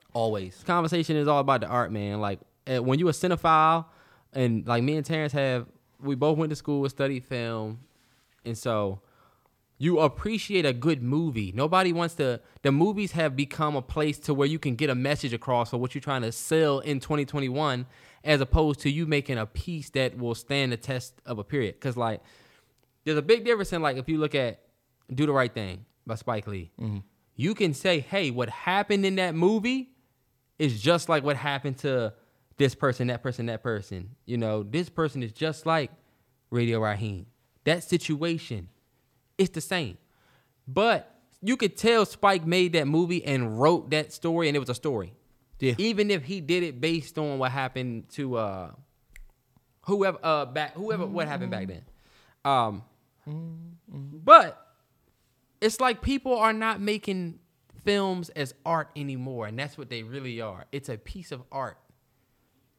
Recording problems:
none

